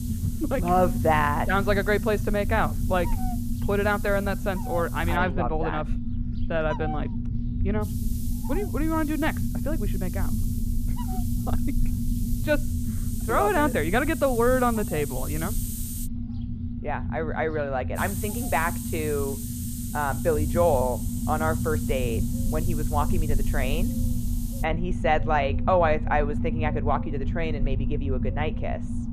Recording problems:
muffled; very; fading above 3.5 kHz
animal sounds; noticeable; throughout; 20 dB below the speech
hiss; noticeable; until 5 s, from 8 to 16 s and from 18 to 25 s; 15 dB below the speech
low rumble; noticeable; throughout; 15 dB below the speech

